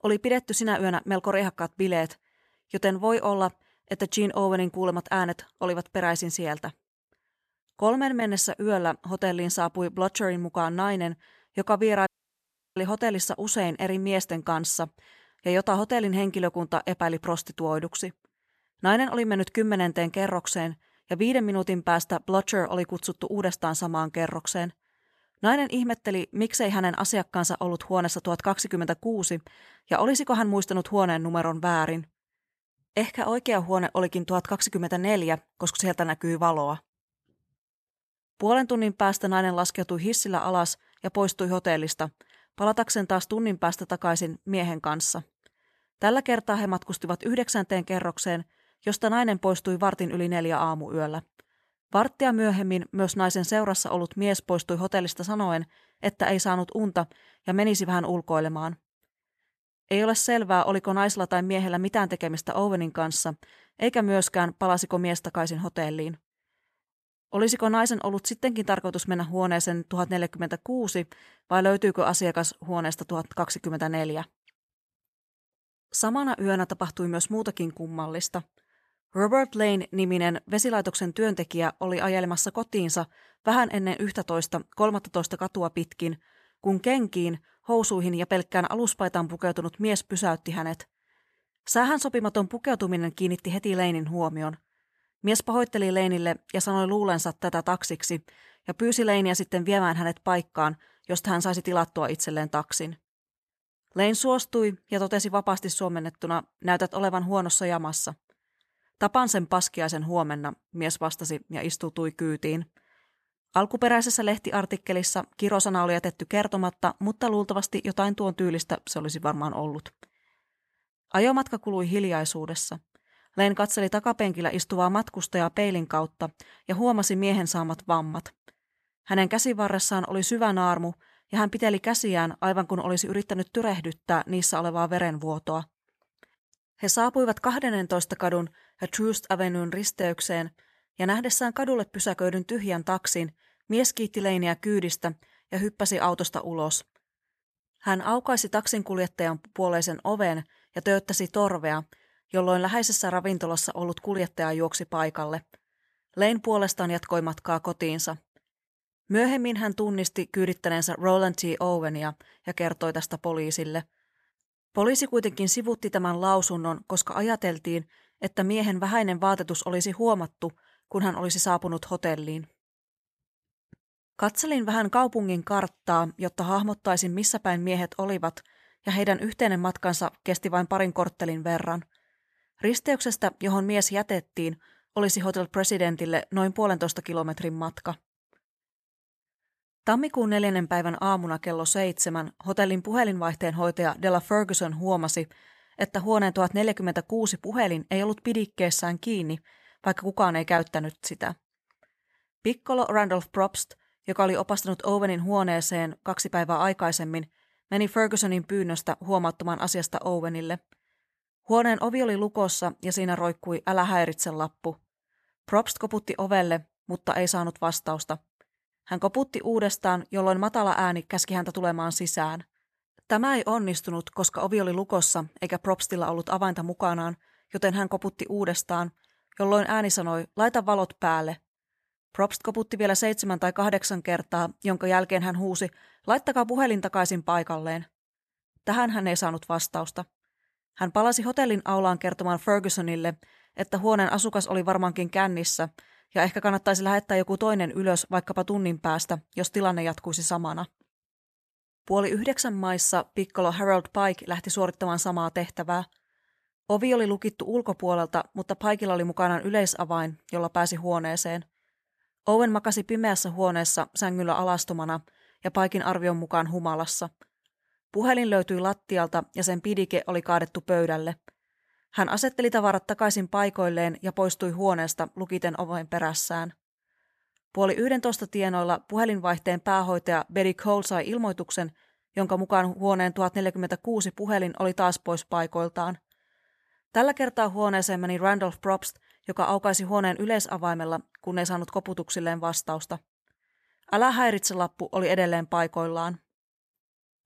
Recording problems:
audio cutting out; at 12 s for 0.5 s

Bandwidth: 14 kHz